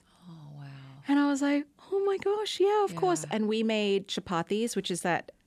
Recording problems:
none

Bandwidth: 13.5 kHz